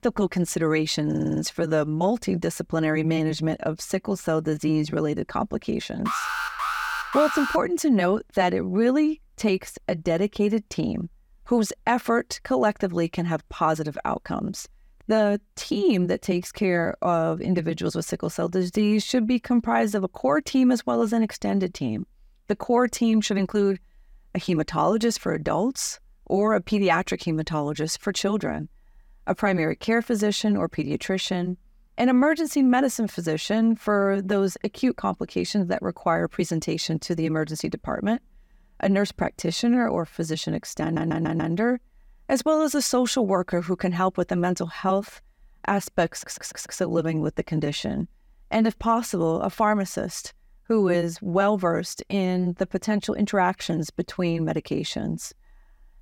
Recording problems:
audio stuttering; at 1 s, at 41 s and at 46 s
alarm; noticeable; from 6 to 7.5 s; peak 2 dB below the speech

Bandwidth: 18 kHz